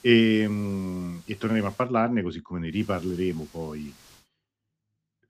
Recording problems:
high frequencies cut off; noticeable; nothing above 8 kHz
hiss; faint; until 2 s and from 2.5 to 4 s; 25 dB below the speech

